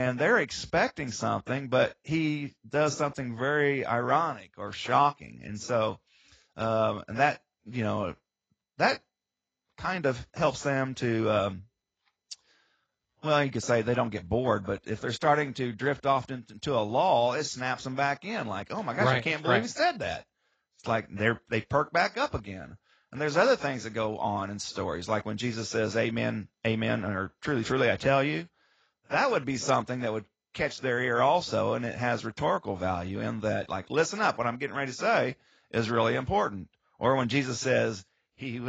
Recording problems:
garbled, watery; badly; nothing above 7.5 kHz
abrupt cut into speech; at the start and the end

